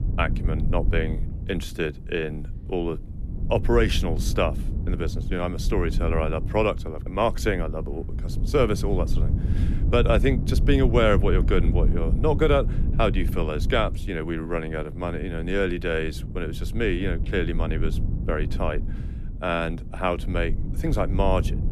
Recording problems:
low rumble; noticeable; throughout; 15 dB below the speech

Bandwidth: 14 kHz